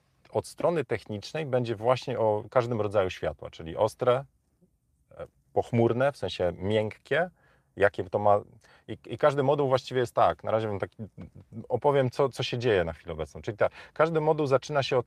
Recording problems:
none

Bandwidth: 15 kHz